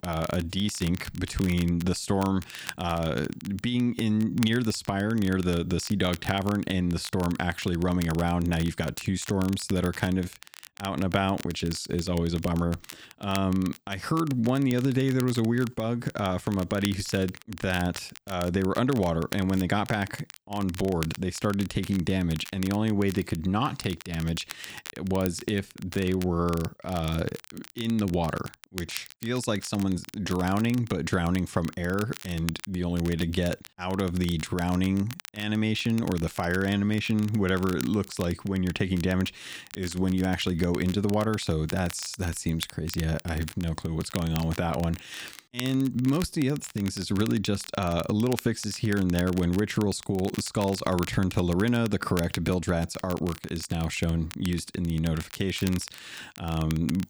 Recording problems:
crackle, like an old record; noticeable; 15 dB below the speech

